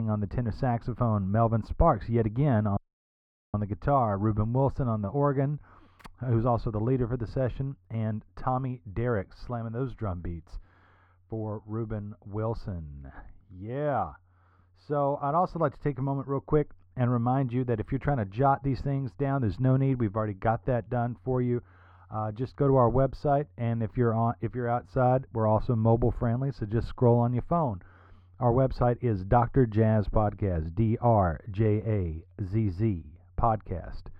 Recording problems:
muffled; very; fading above 3.5 kHz
abrupt cut into speech; at the start
audio cutting out; at 3 s for 1 s

